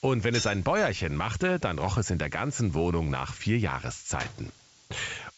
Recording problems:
high frequencies cut off; noticeable; nothing above 8 kHz
hiss; faint; throughout; 25 dB below the speech
jangling keys; noticeable; at 0.5 s; peak 5 dB below the speech
door banging; faint; at 4 s; peak 15 dB below the speech

